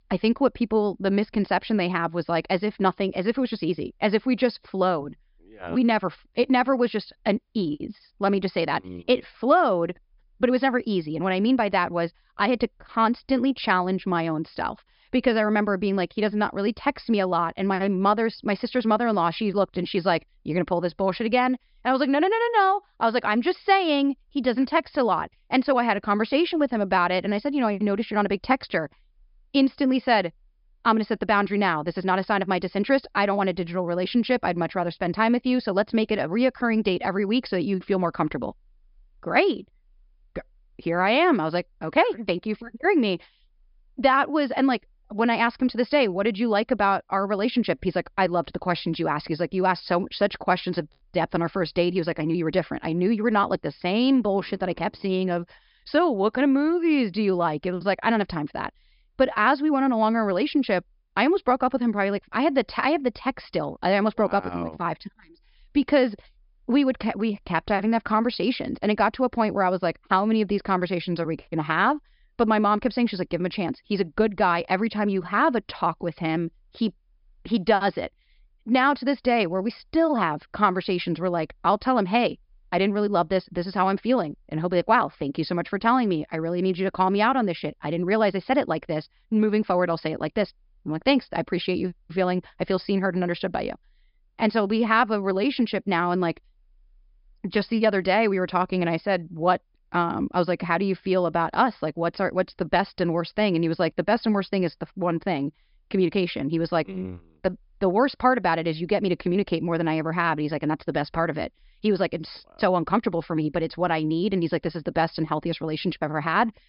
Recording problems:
high frequencies cut off; noticeable; nothing above 5.5 kHz

